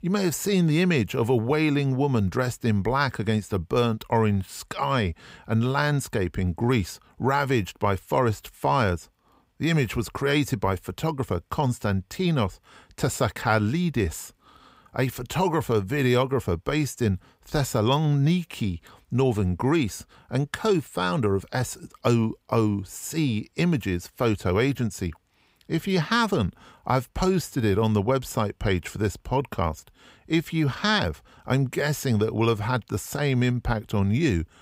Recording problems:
none

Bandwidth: 15.5 kHz